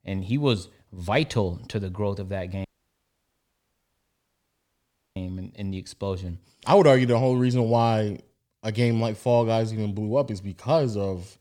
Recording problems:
audio cutting out; at 2.5 s for 2.5 s

